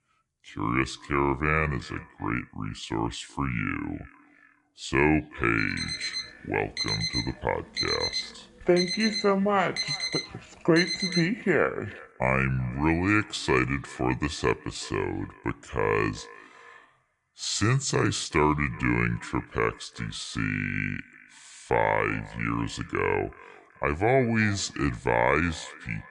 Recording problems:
wrong speed and pitch; too slow and too low; 0.7 times normal speed
echo of what is said; faint; throughout; 380 ms later, 20 dB below the speech
alarm; noticeable; from 5.5 to 11 s; peak level with the speech

